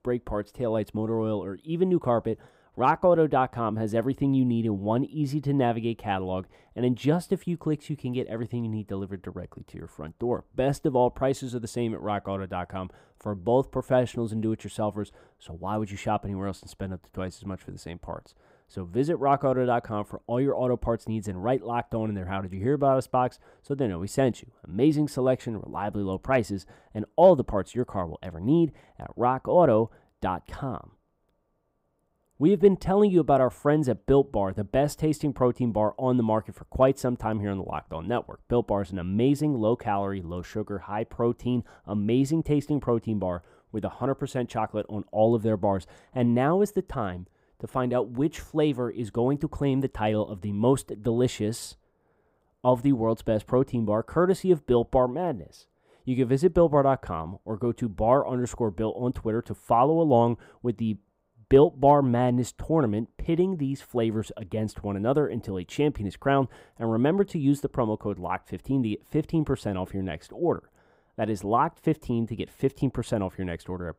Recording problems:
muffled; slightly; fading above 1.5 kHz

